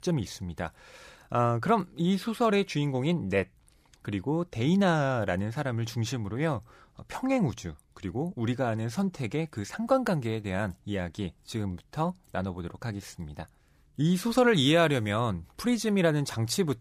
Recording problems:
none

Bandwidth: 15 kHz